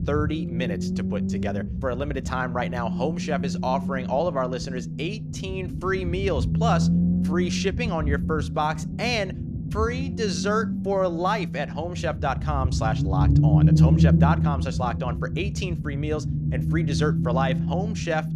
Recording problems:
low rumble; loud; throughout; 7 dB below the speech

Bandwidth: 14.5 kHz